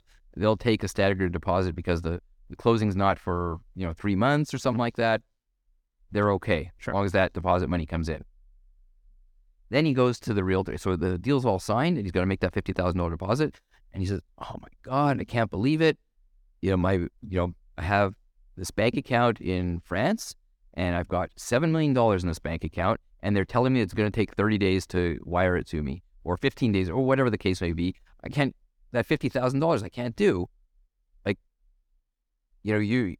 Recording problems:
none

